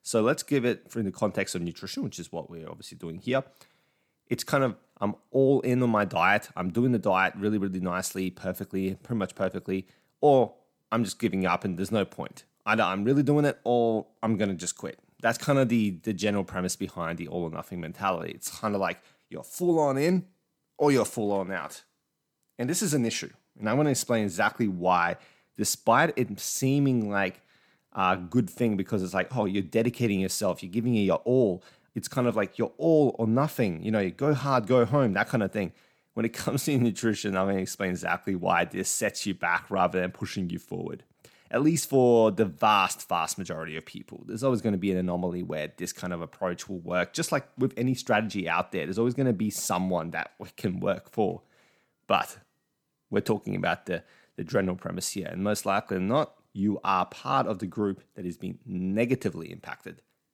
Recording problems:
none

